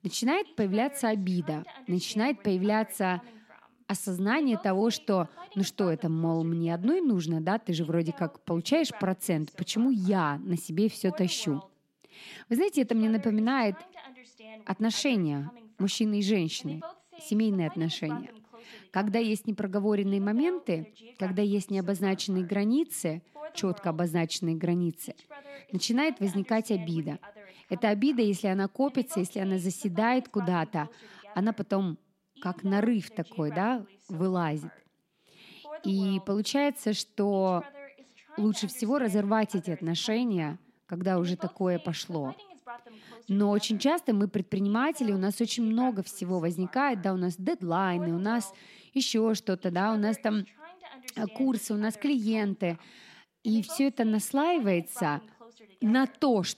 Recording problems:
voice in the background; faint; throughout; 20 dB below the speech

